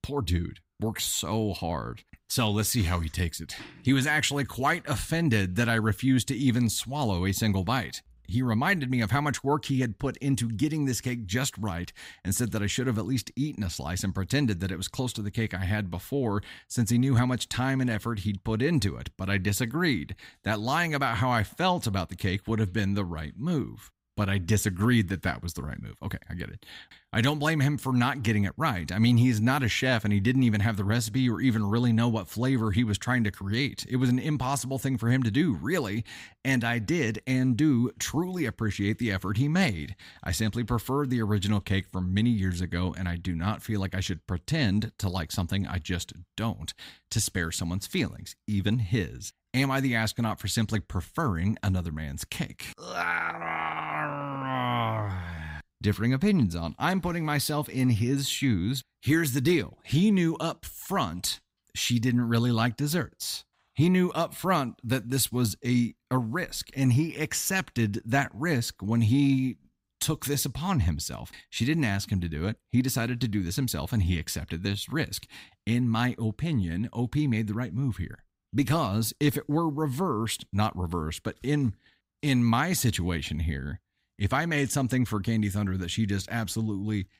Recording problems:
none

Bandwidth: 15.5 kHz